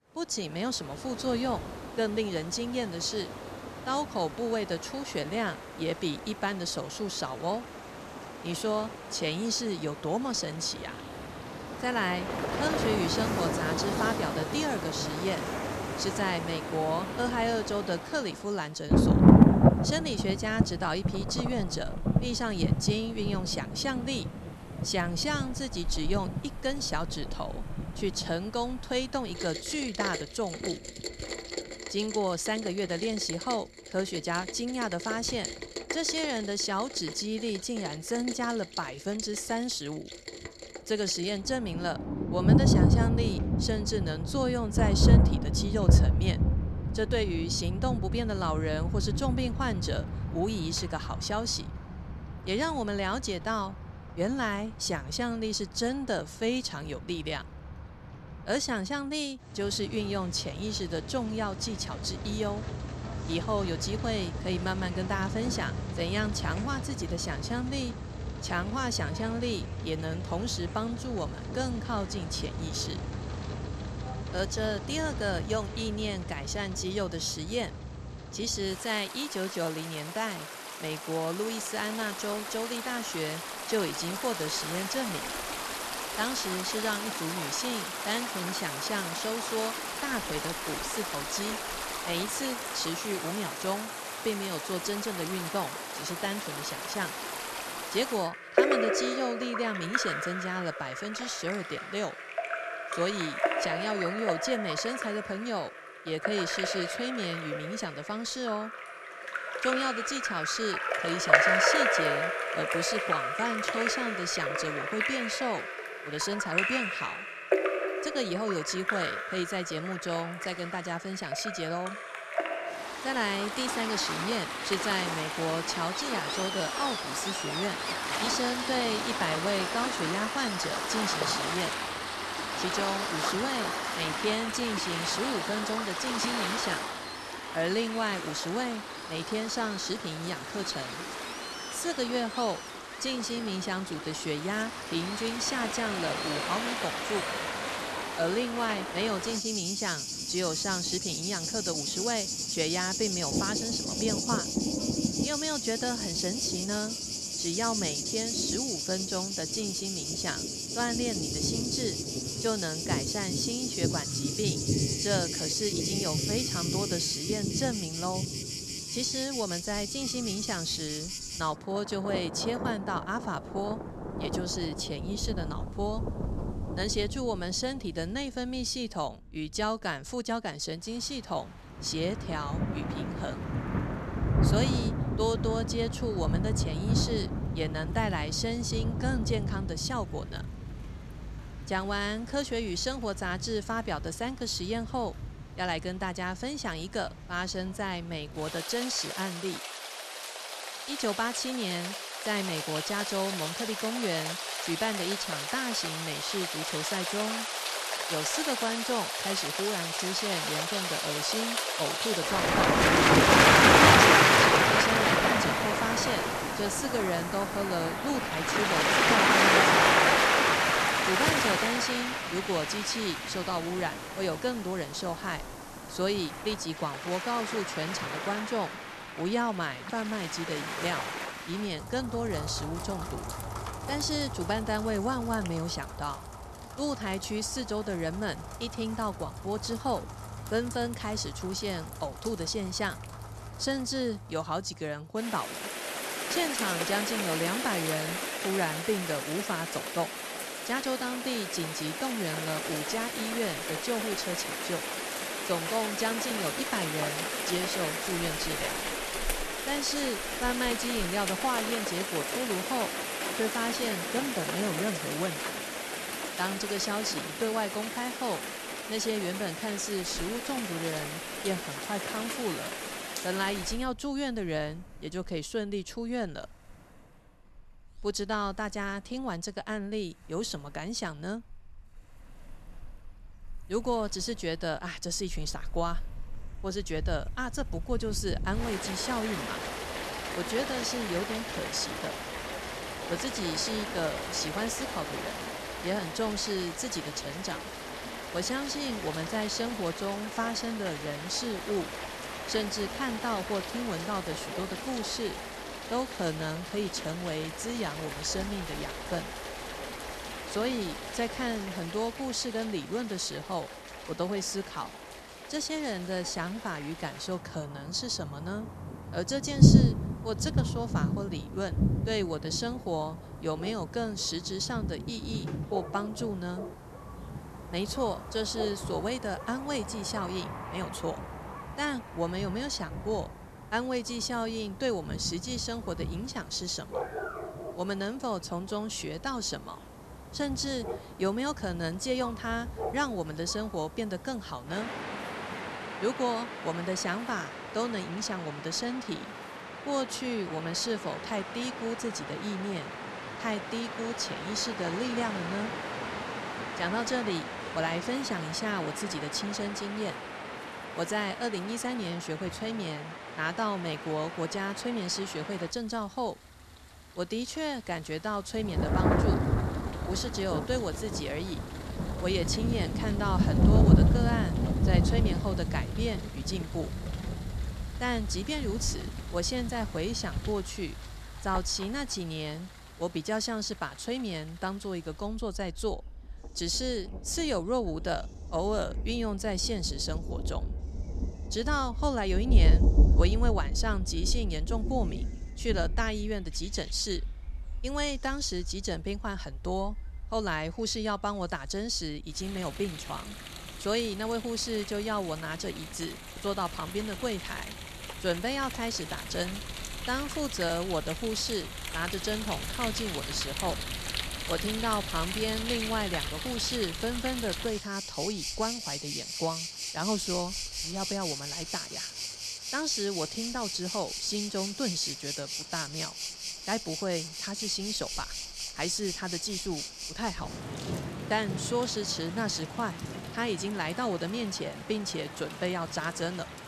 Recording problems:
rain or running water; very loud; throughout; 1 dB above the speech

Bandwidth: 13.5 kHz